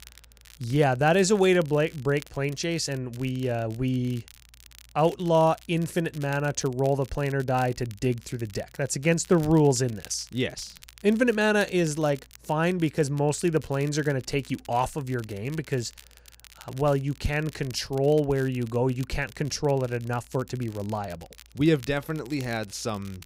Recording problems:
crackle, like an old record; faint; 25 dB below the speech

